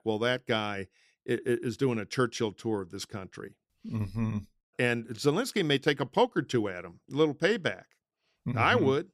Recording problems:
none

